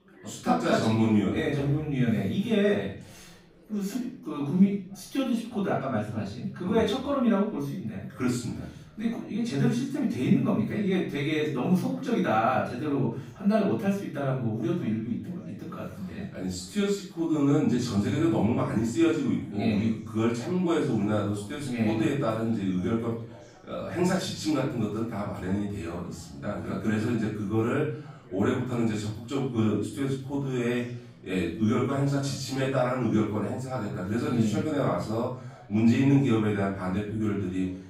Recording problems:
off-mic speech; far
room echo; noticeable; dies away in 0.5 s
chatter from many people; faint; throughout; 25 dB below the speech

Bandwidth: 15.5 kHz